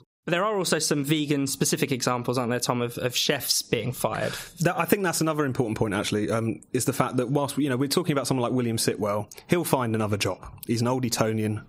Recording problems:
squashed, flat; somewhat

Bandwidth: 15.5 kHz